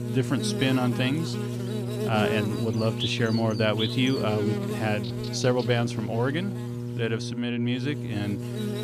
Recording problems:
electrical hum; loud; throughout; 60 Hz, 5 dB below the speech

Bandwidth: 14.5 kHz